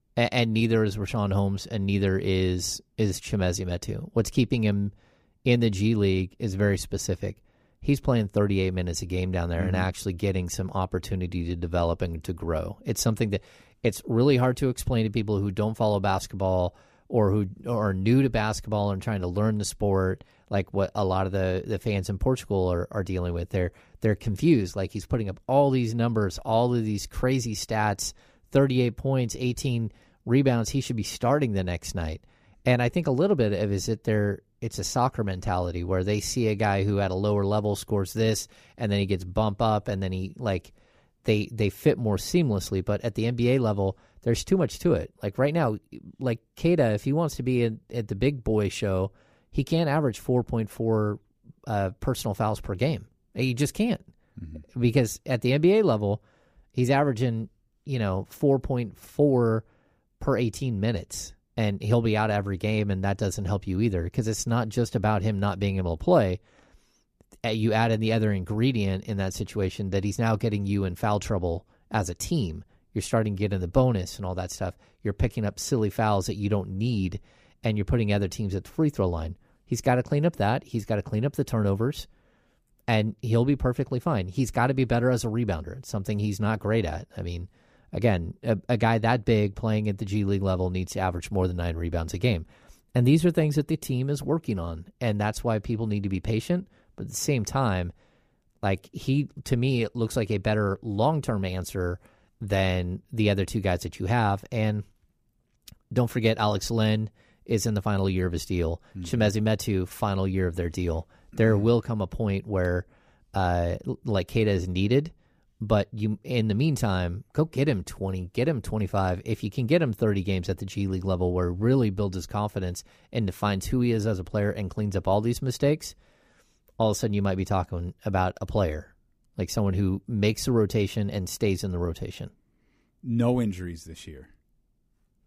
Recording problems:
none

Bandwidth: 15 kHz